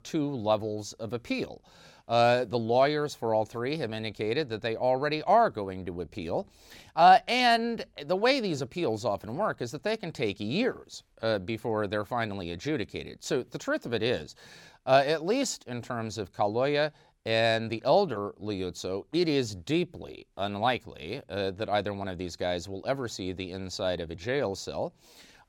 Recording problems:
none

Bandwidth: 17 kHz